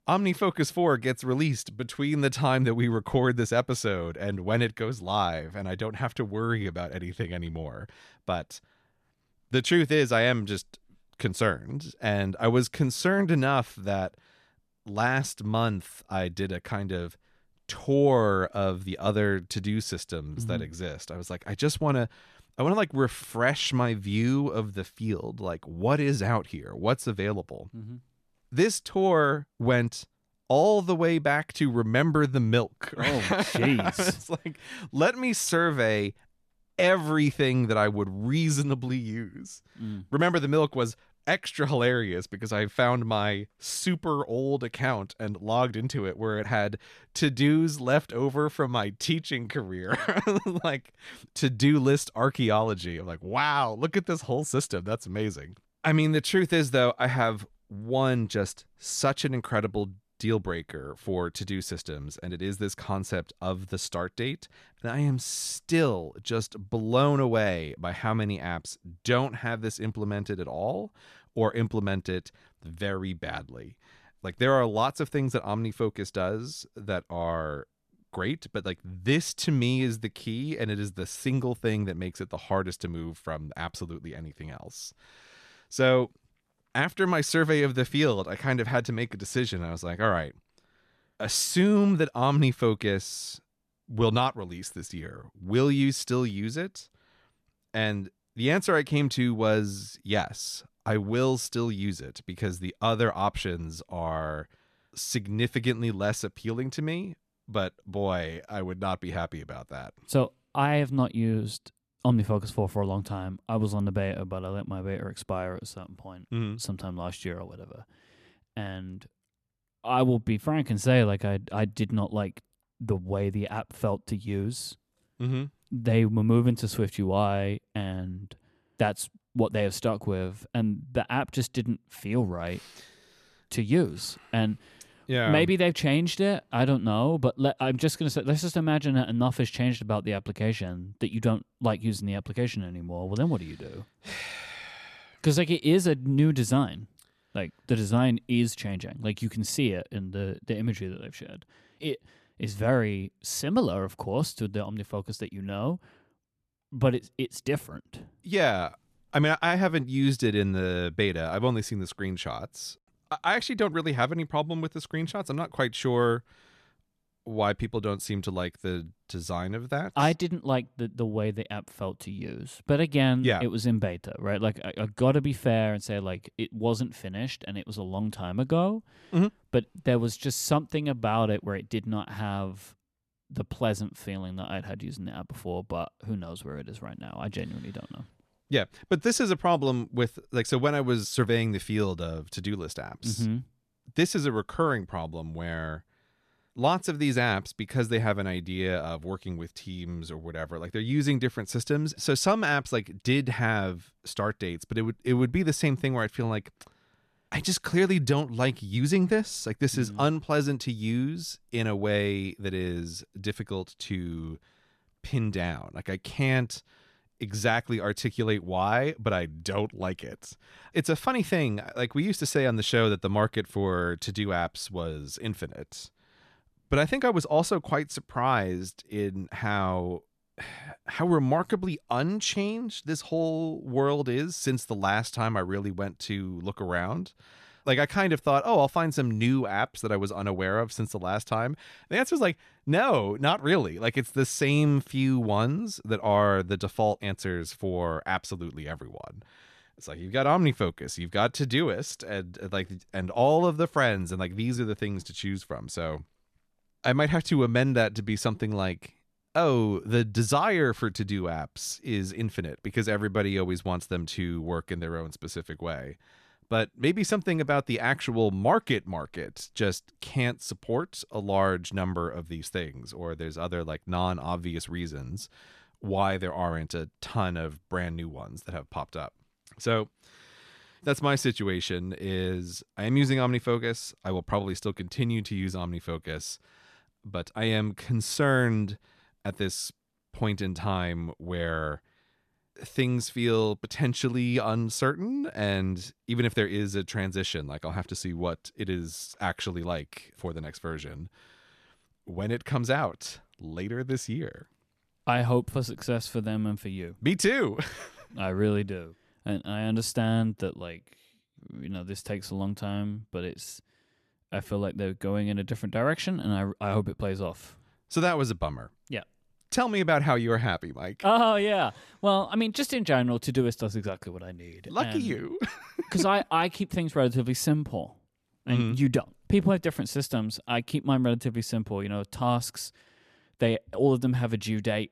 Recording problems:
none

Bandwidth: 14 kHz